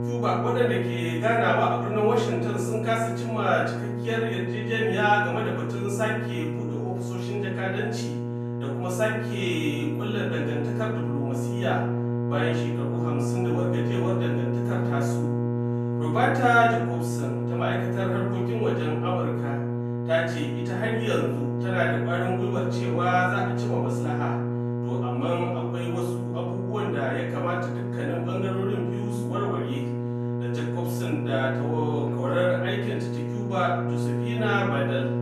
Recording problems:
off-mic speech; far
room echo; noticeable; dies away in 0.7 s
electrical hum; loud; throughout; 60 Hz, 7 dB below the speech

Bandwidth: 14 kHz